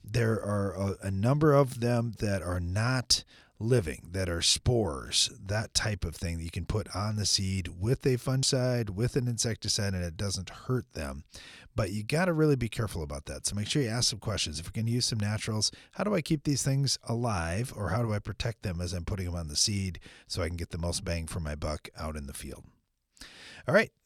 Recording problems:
none

